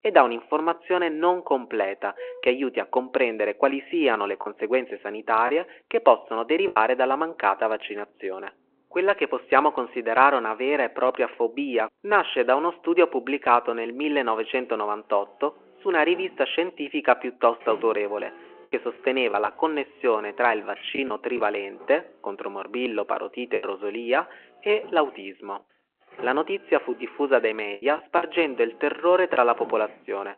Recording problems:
phone-call audio
traffic noise; faint; throughout; 25 dB below the speech
choppy; occasionally; 2% of the speech affected

